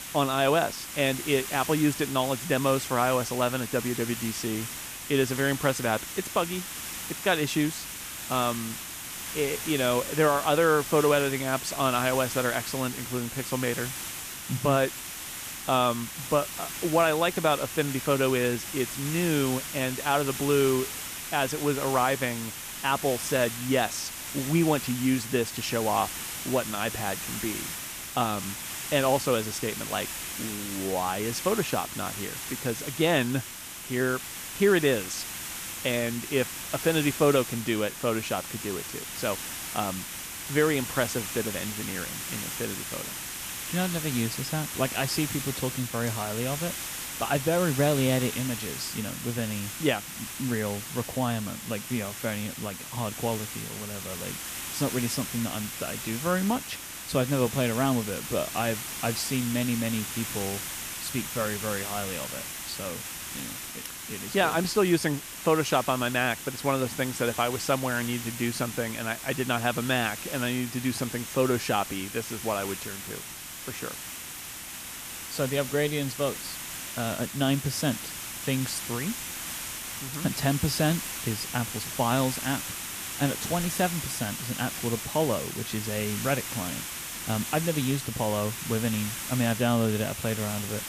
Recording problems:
hiss; loud; throughout; 6 dB below the speech

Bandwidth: 14.5 kHz